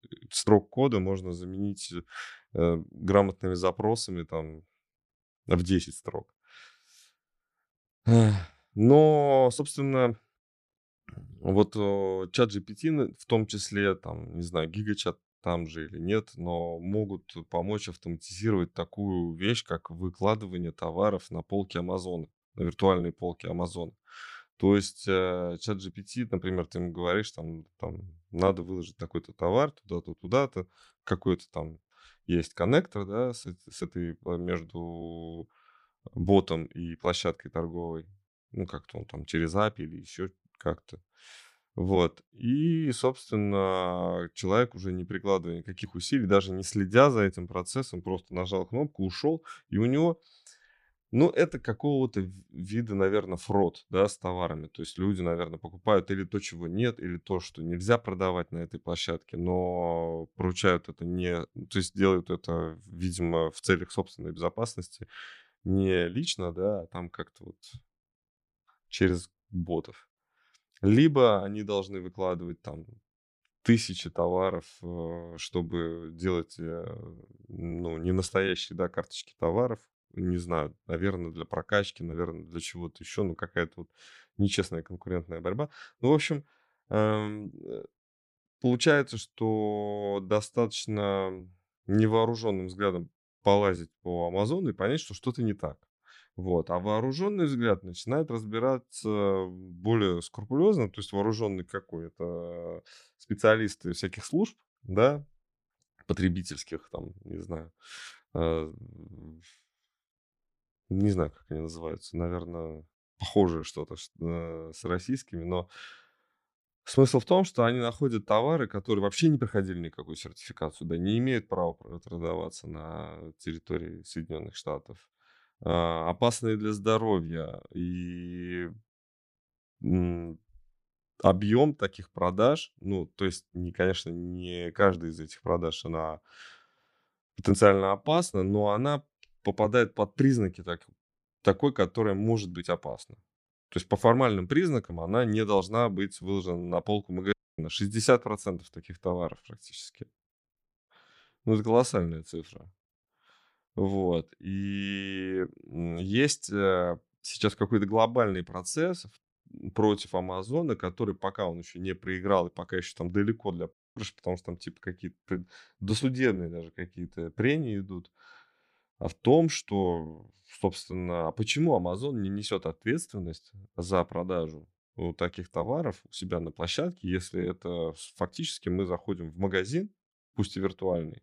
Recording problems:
audio cutting out; at 2:27 and at 2:44

